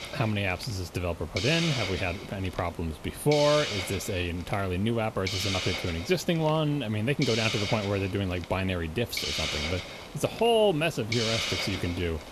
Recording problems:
hiss; loud; throughout; 4 dB below the speech

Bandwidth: 13.5 kHz